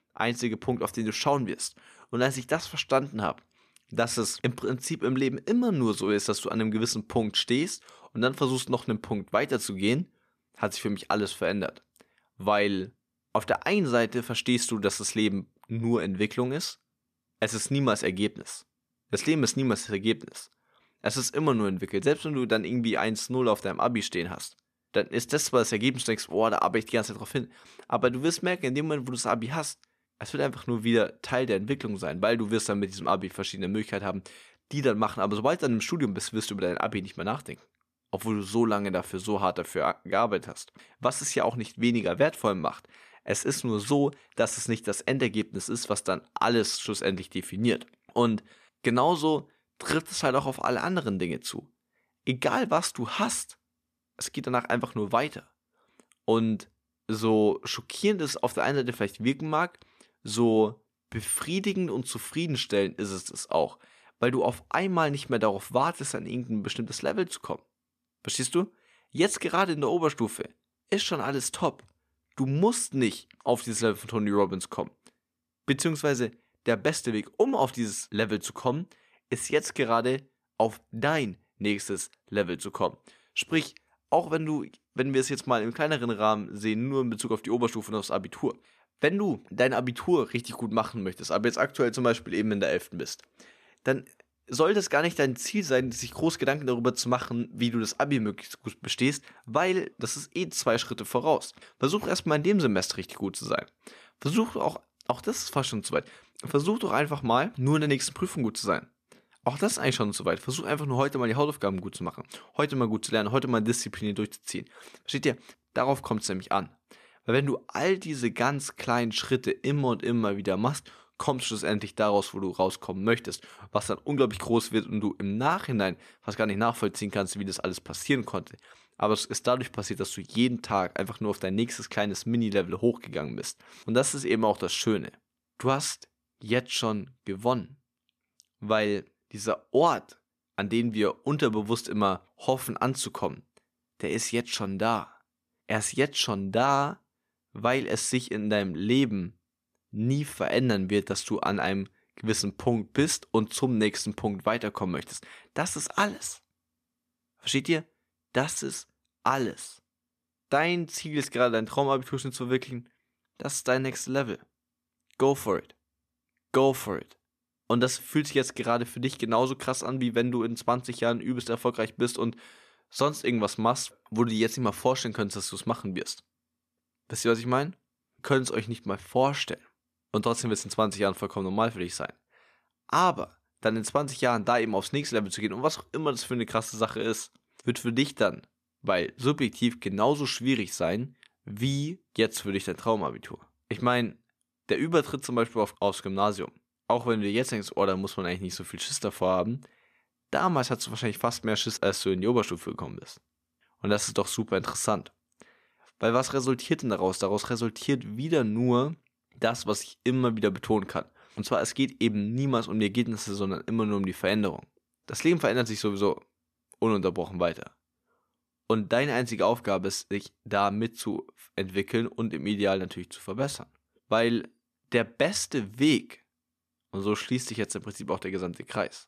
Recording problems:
none

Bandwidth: 14.5 kHz